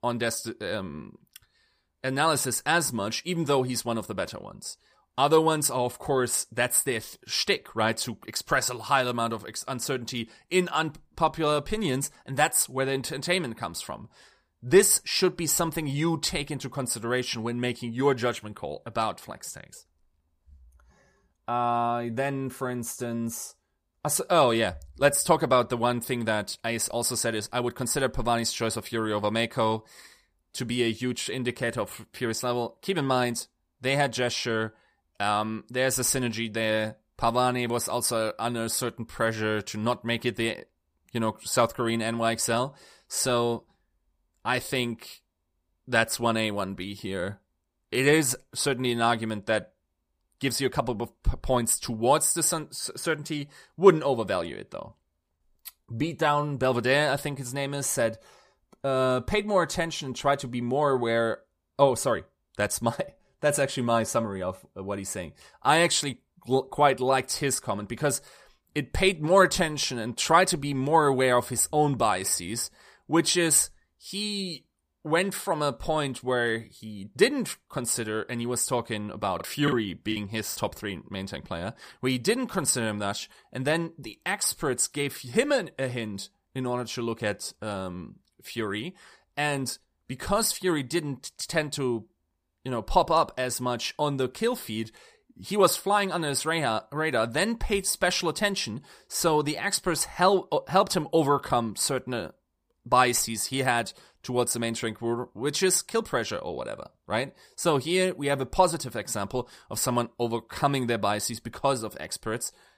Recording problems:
choppy; very; from 1:19 to 1:21; 5% of the speech affected

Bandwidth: 15 kHz